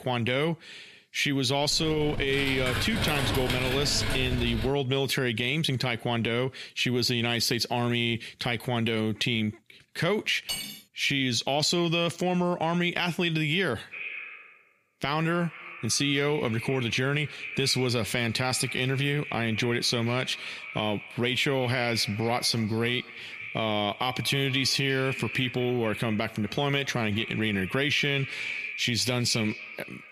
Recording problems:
echo of what is said; strong; from 14 s on; 240 ms later, 10 dB below the speech
squashed, flat; somewhat
keyboard typing; noticeable; from 1.5 to 4.5 s; peak 2 dB below the speech
clattering dishes; noticeable; at 10 s; peak 6 dB below the speech

